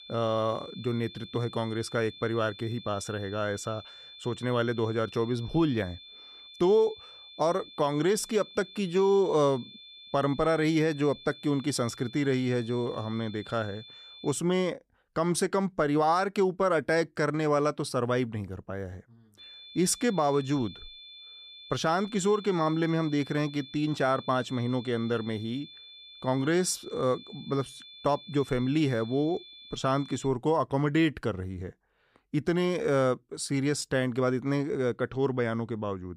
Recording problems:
high-pitched whine; noticeable; until 14 s and from 19 to 30 s; 3.5 kHz, 15 dB below the speech

